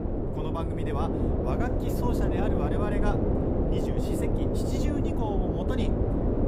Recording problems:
wind noise on the microphone; heavy; 5 dB above the speech

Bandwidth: 15.5 kHz